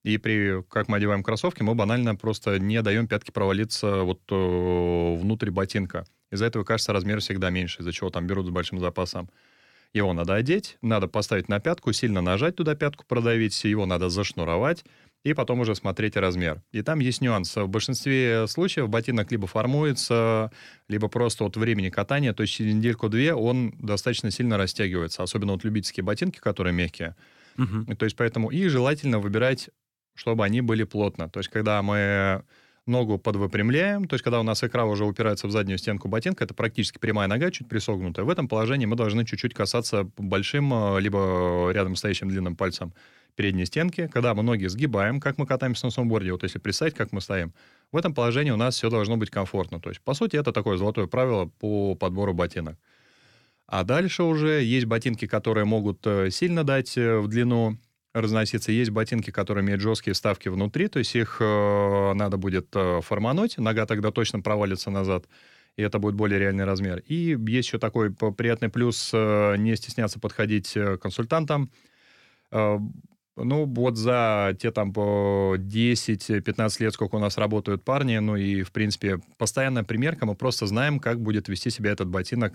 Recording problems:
none

